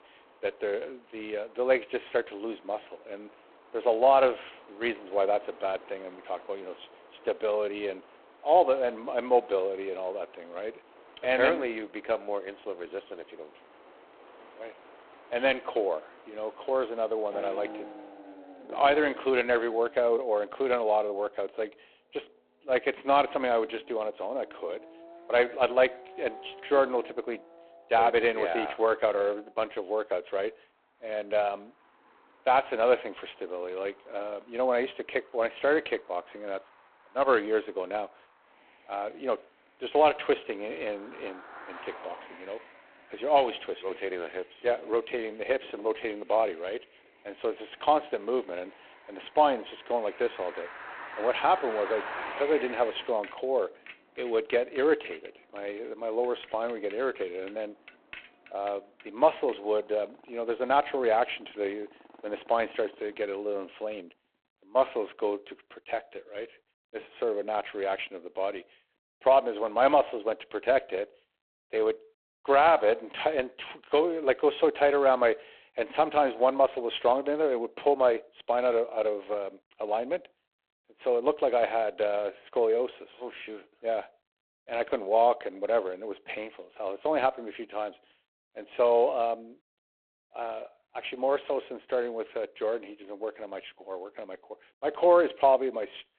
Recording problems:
phone-call audio; poor line
traffic noise; noticeable; until 1:05; 20 dB below the speech

